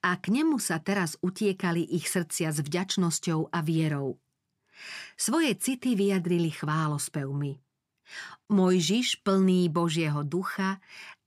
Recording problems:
none

